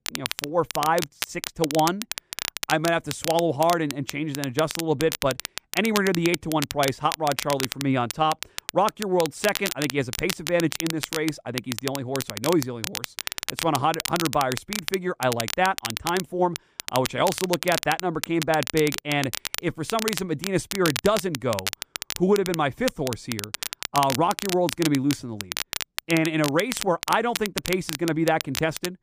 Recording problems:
crackle, like an old record; loud; 6 dB below the speech

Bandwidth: 15 kHz